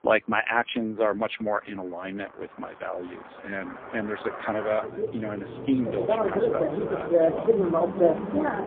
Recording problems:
phone-call audio; poor line; nothing above 3.5 kHz
traffic noise; very loud; throughout; 3 dB above the speech

